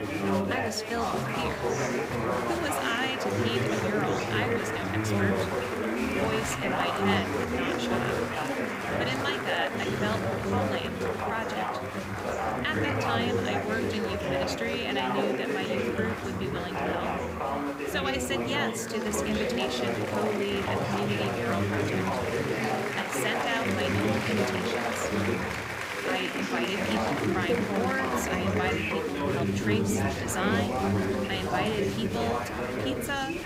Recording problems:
chatter from many people; very loud; throughout; 4 dB above the speech
hiss; faint; throughout; 25 dB below the speech

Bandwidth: 15.5 kHz